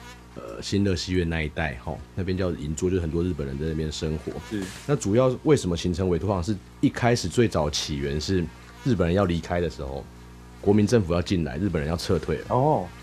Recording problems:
electrical hum; faint; throughout; 60 Hz, 20 dB below the speech

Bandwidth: 14 kHz